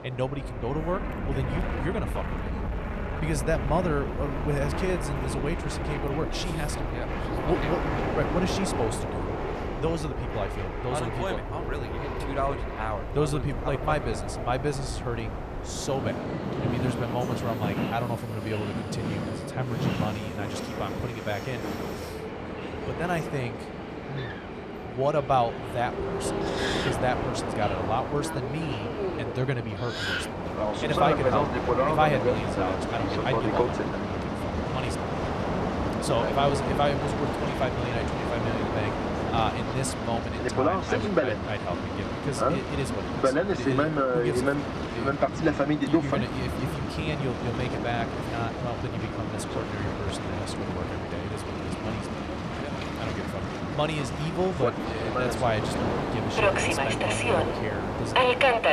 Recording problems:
train or aircraft noise; very loud; throughout; 2 dB above the speech

